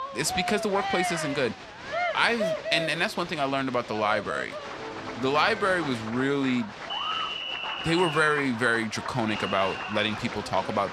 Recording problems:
crowd noise; loud; throughout; 6 dB below the speech

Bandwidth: 14 kHz